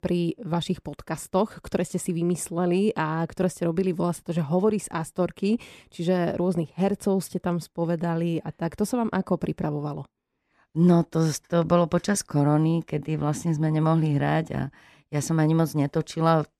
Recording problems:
none

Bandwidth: 14 kHz